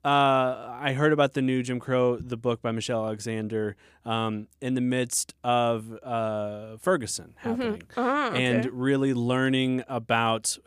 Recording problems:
none

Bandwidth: 15 kHz